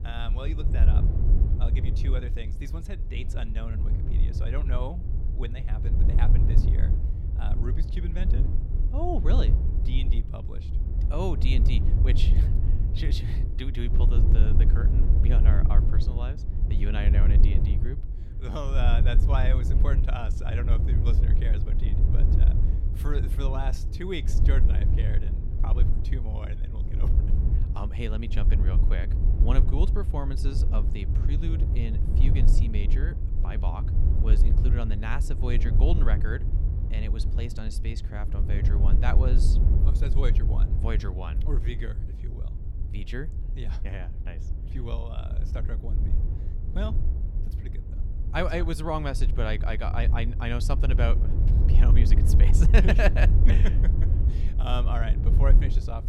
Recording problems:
wind noise on the microphone; heavy; 6 dB below the speech

